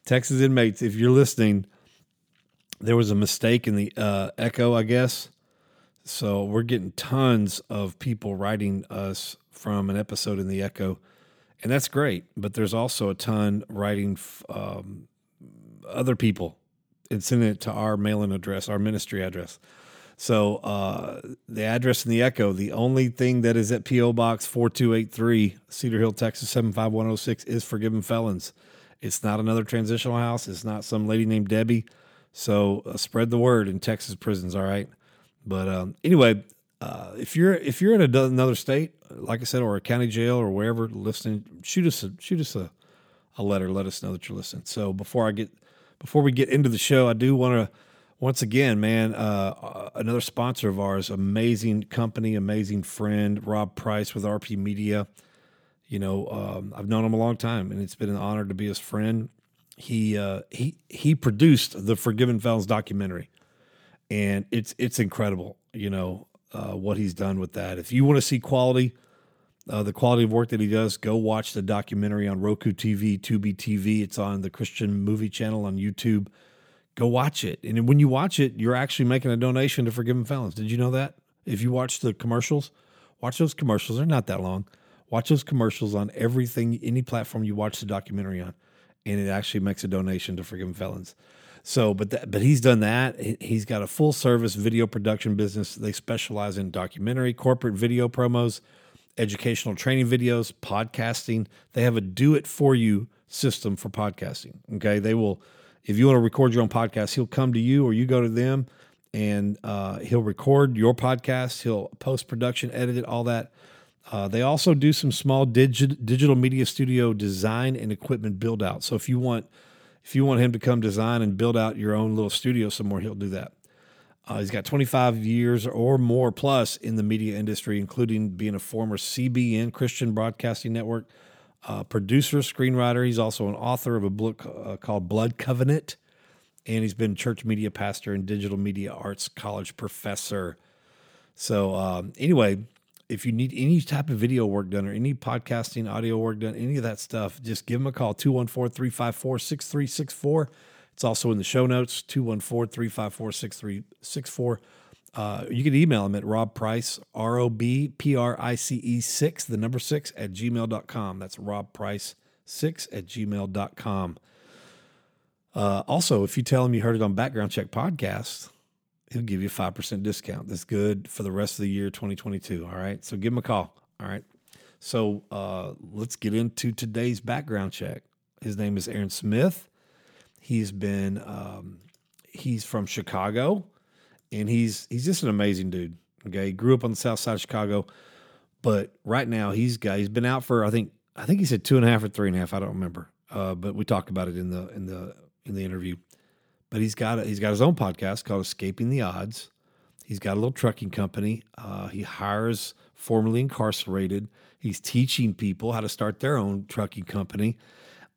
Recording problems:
none

